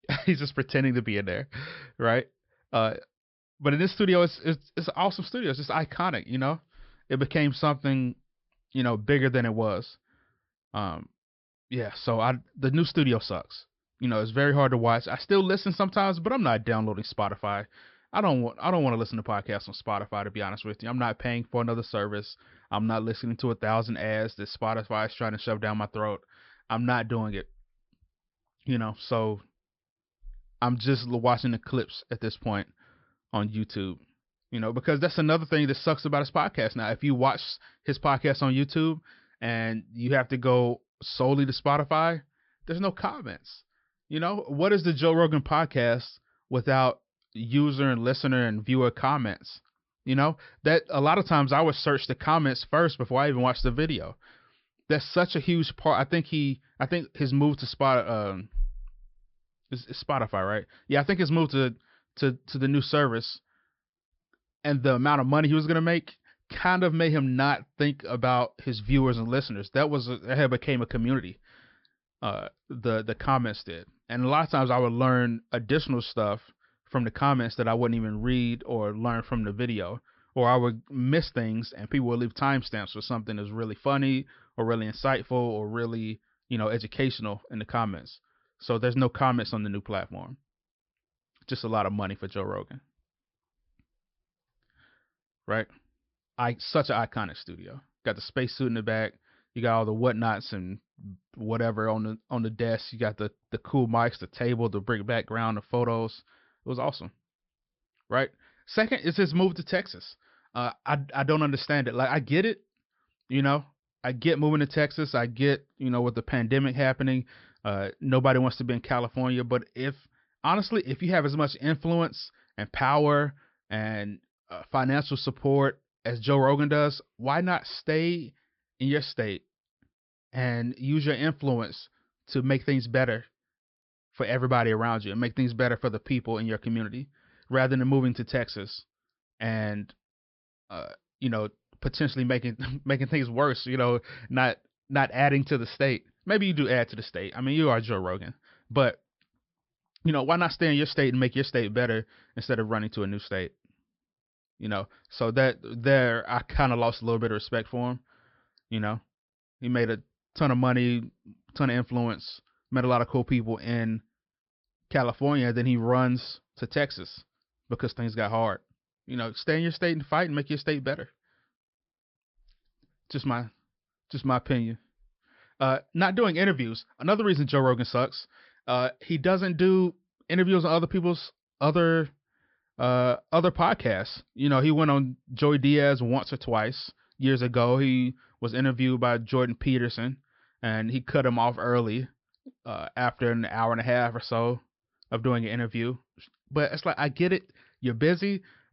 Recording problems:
high frequencies cut off; noticeable; nothing above 5.5 kHz

